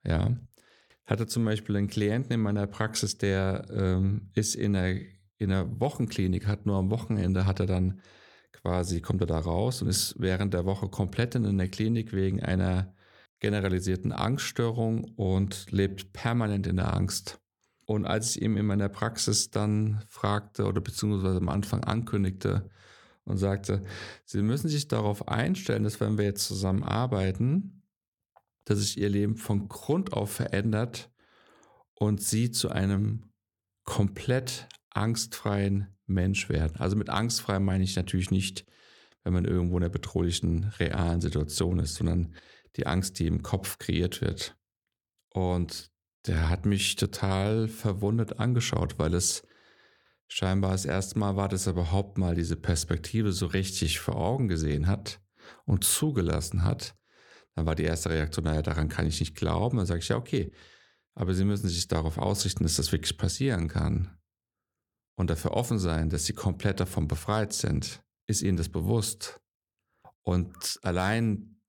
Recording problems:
none

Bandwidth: 18 kHz